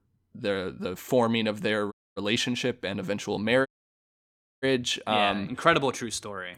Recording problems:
audio cutting out; at 2 s and at 3.5 s for 1 s

